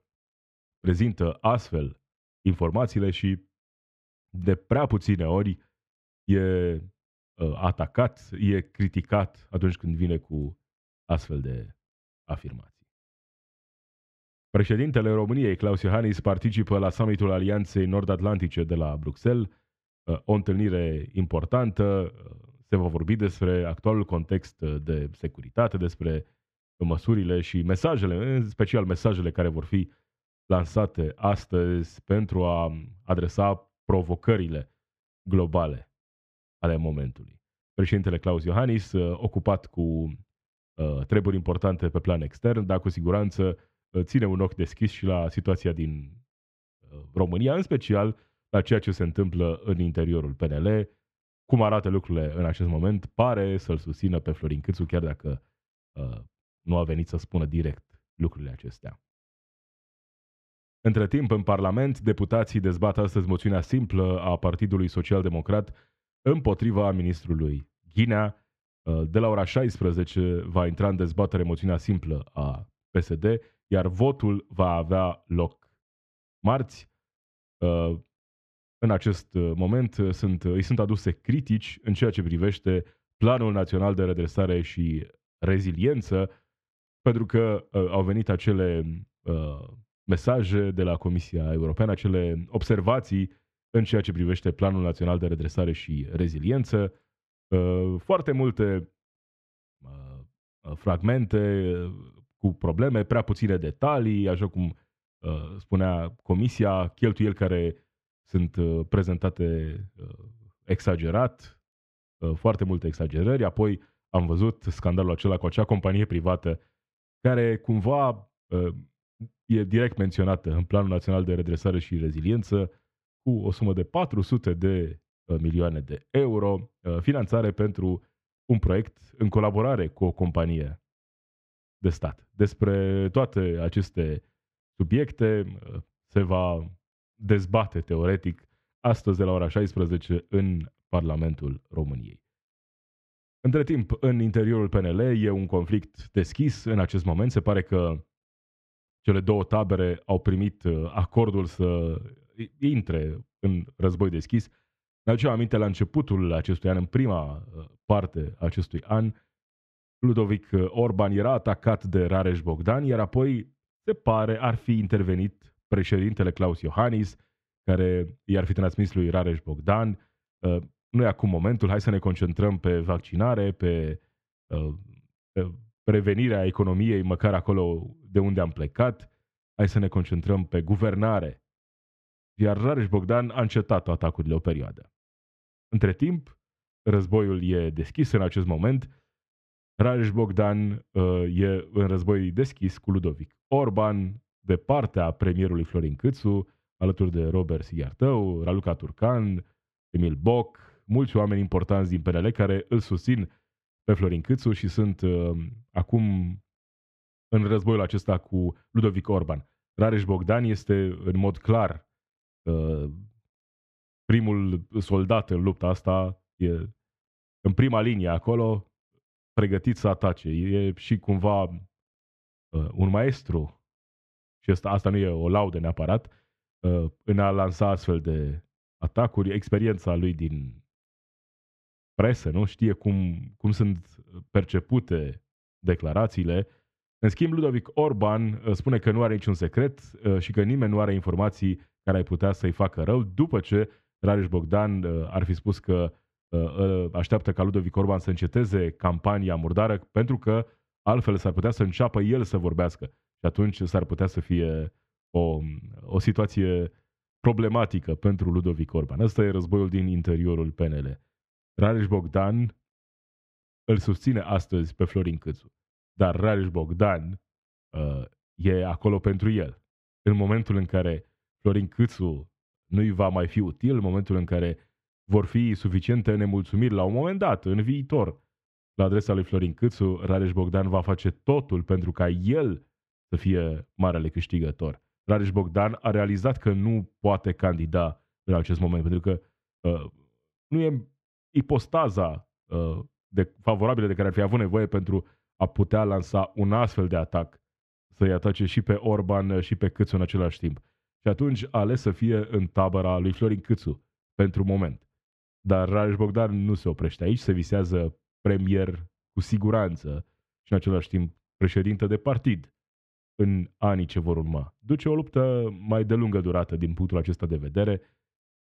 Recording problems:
muffled; slightly; fading above 3 kHz

